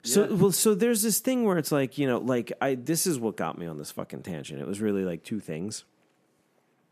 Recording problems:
none

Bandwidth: 14.5 kHz